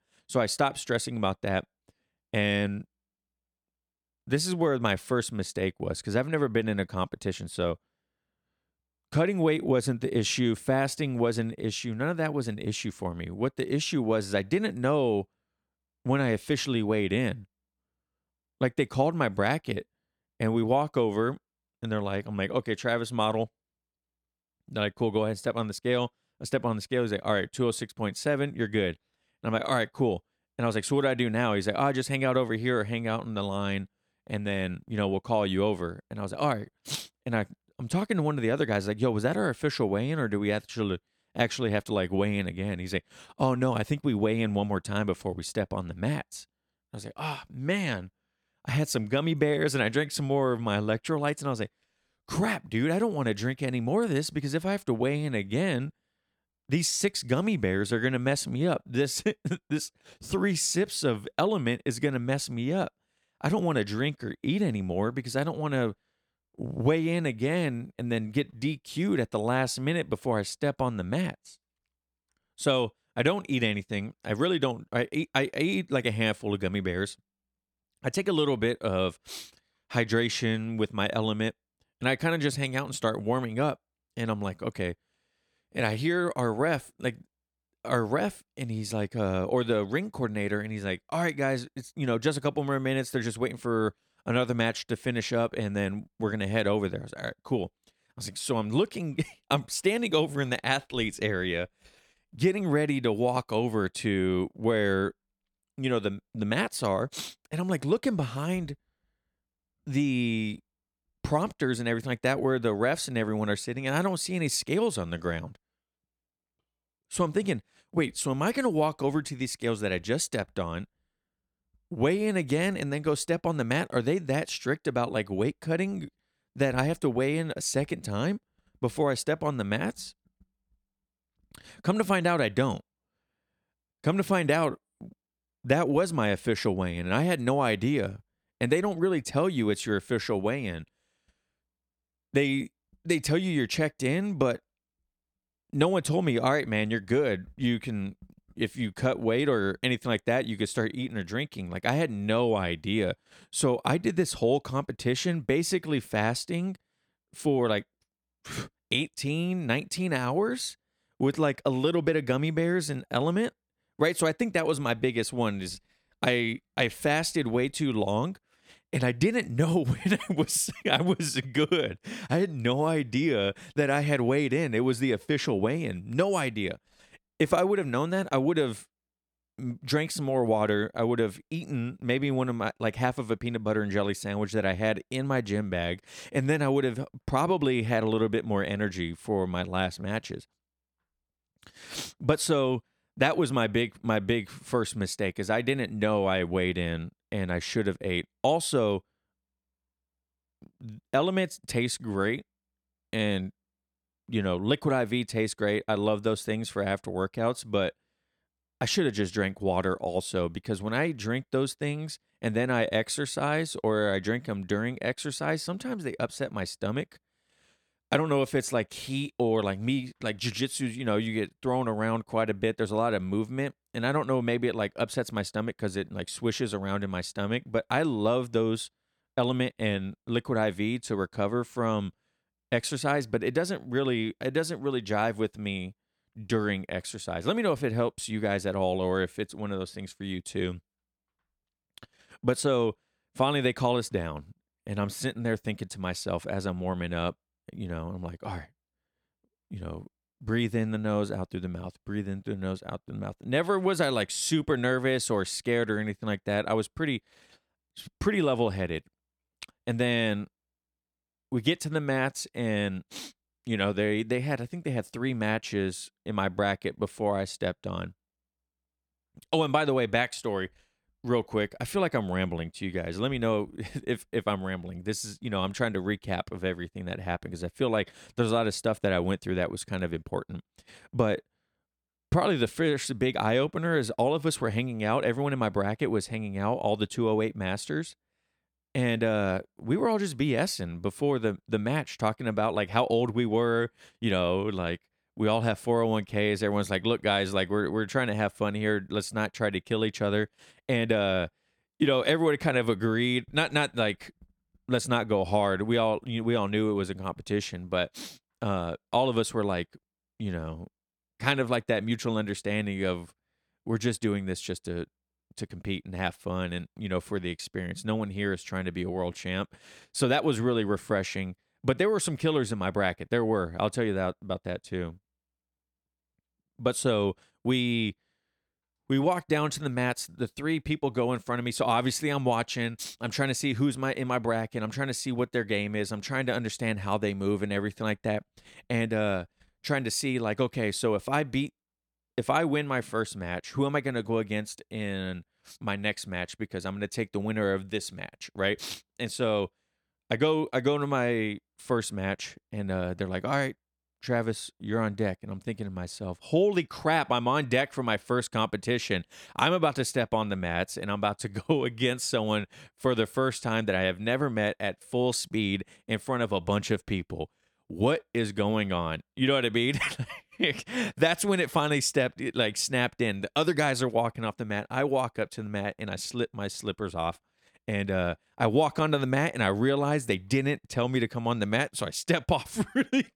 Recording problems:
none

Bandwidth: 18 kHz